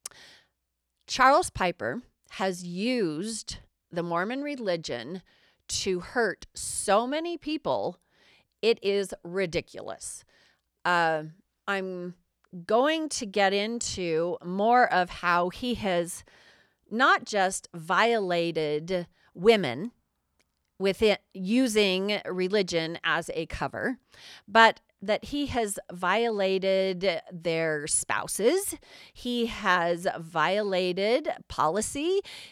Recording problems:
none

